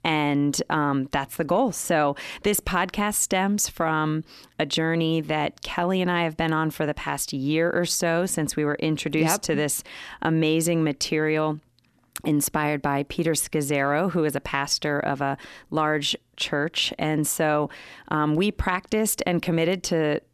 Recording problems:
none

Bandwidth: 13.5 kHz